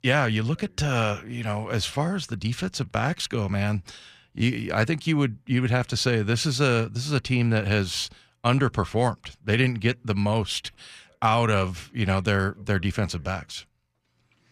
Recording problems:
none

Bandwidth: 14.5 kHz